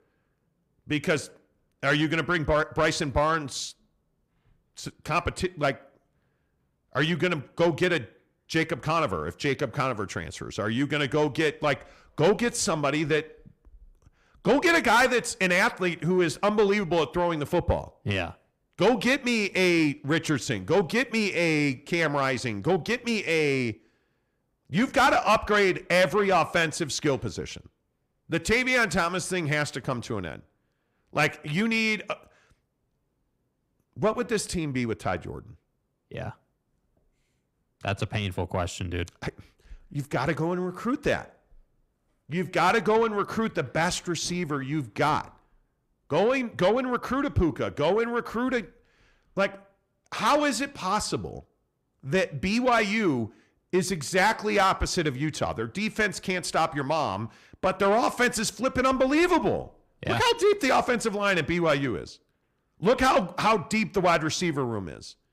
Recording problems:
distortion; slight; 10 dB below the speech

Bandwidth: 15.5 kHz